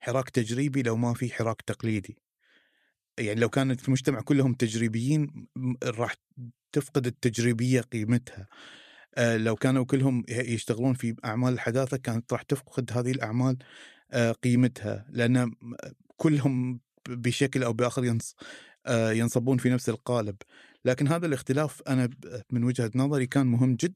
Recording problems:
none

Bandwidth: 14.5 kHz